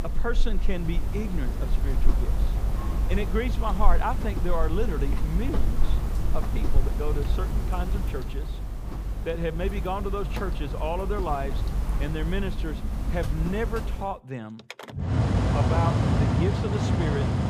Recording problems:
machinery noise; very loud; throughout; 4 dB above the speech

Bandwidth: 15 kHz